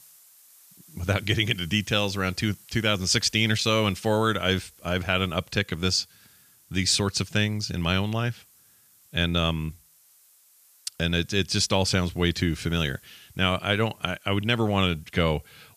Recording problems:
hiss; faint; throughout; 25 dB below the speech

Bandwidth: 14.5 kHz